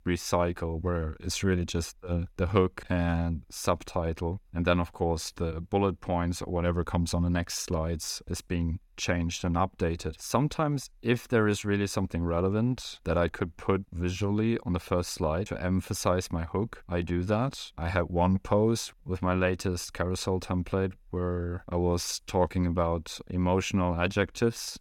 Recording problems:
none

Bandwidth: 17.5 kHz